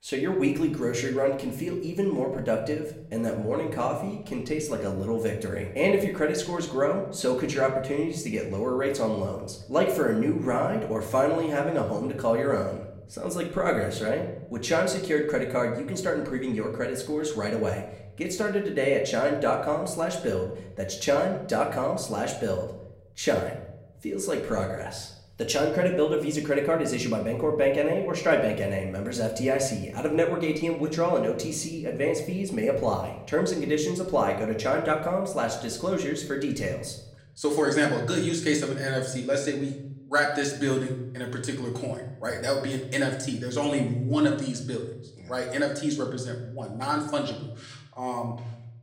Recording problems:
room echo; slight; dies away in 0.7 s
off-mic speech; somewhat distant

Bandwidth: 16 kHz